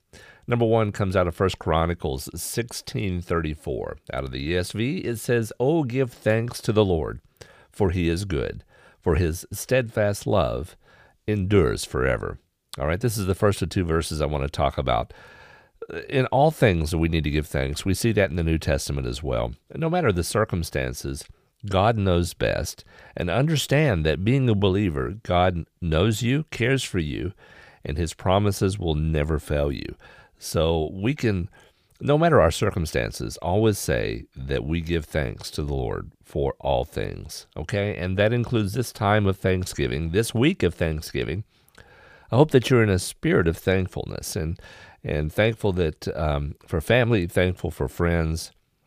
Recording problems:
none

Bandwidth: 15 kHz